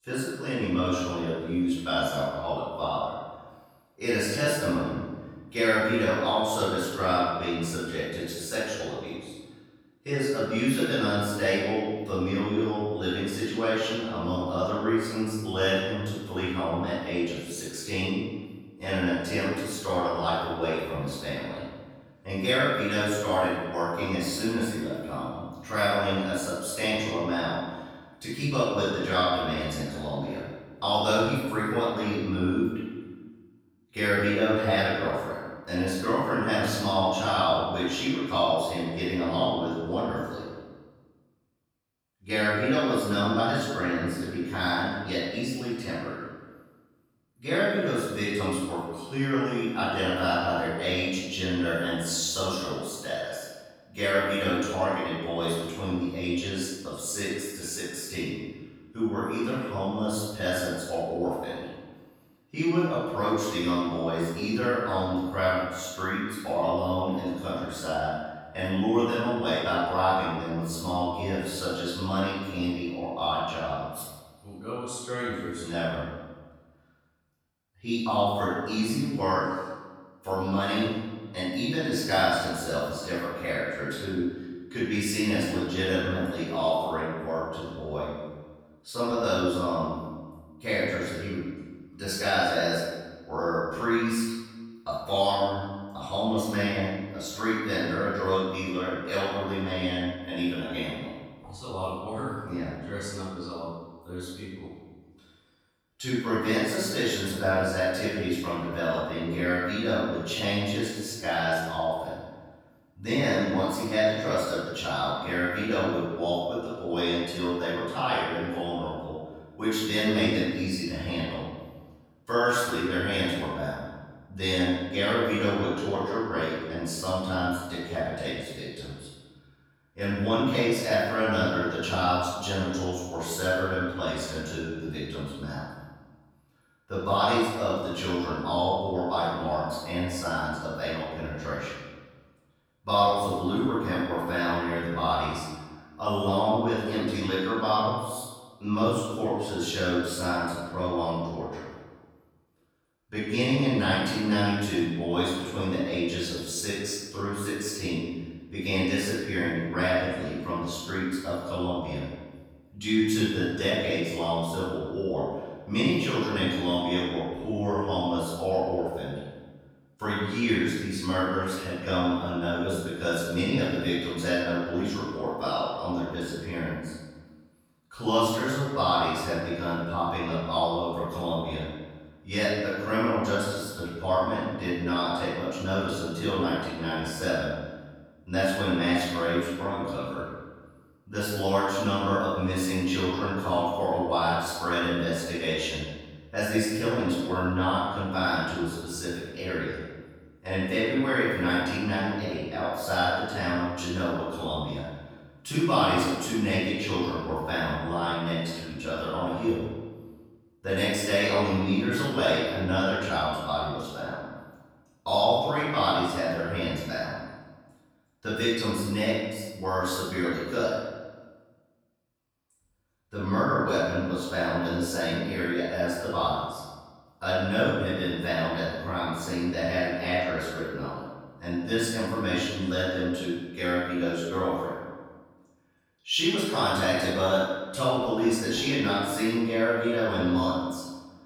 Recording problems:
room echo; strong; dies away in 1.2 s
off-mic speech; far

